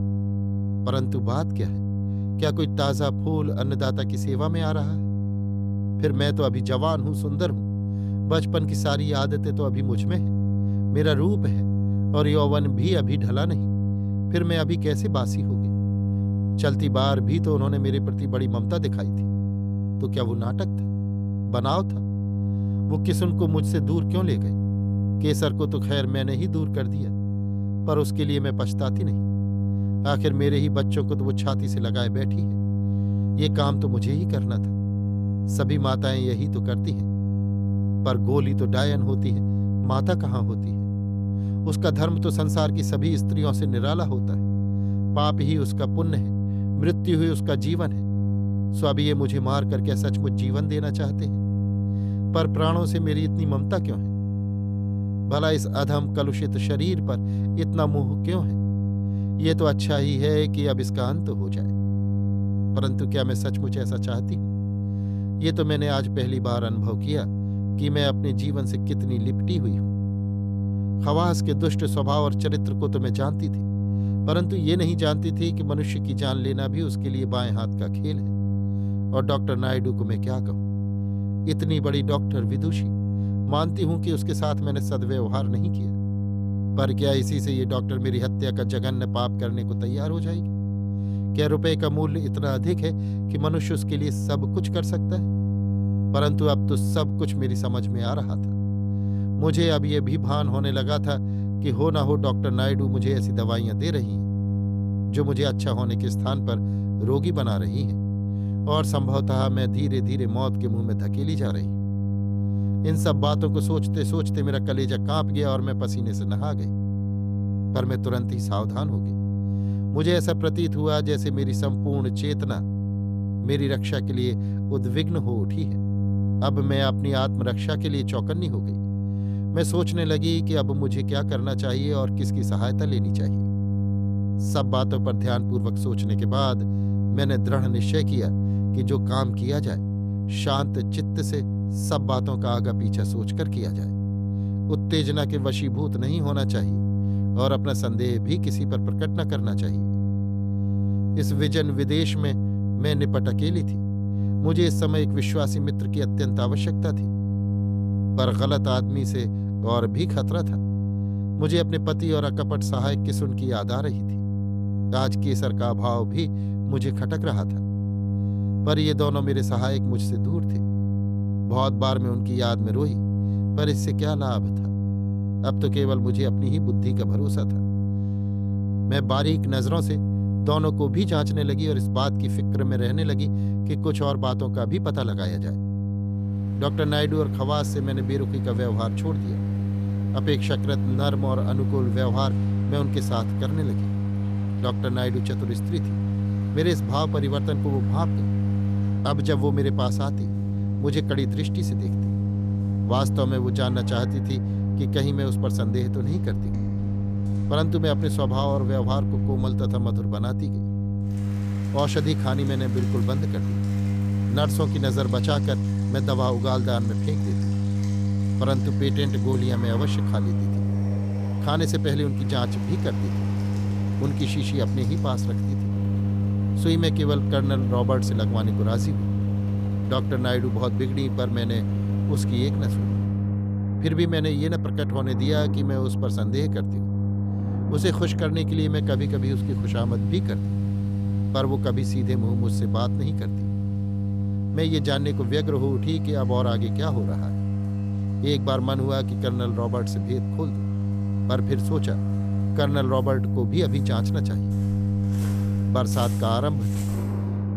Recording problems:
electrical hum; loud; throughout; 50 Hz, 6 dB below the speech
rain or running water; noticeable; from 3:06 on; 15 dB below the speech

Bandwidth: 14.5 kHz